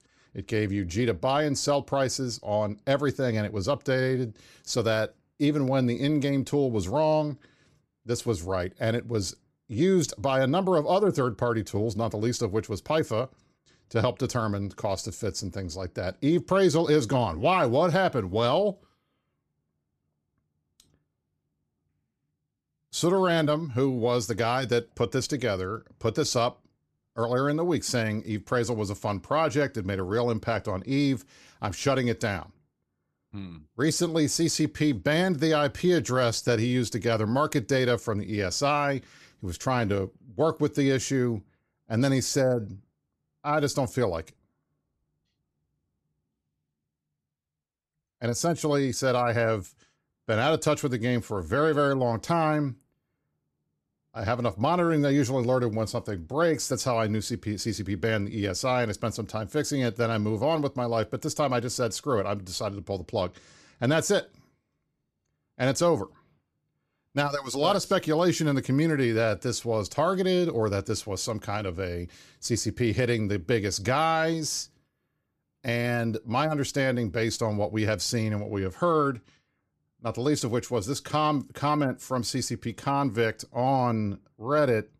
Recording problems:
none

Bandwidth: 14.5 kHz